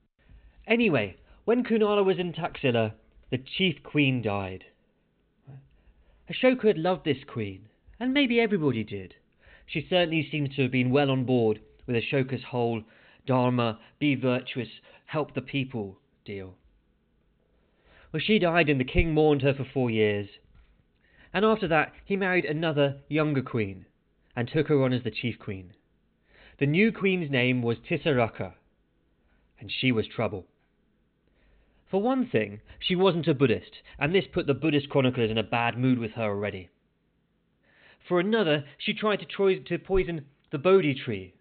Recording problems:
high frequencies cut off; severe; nothing above 4 kHz

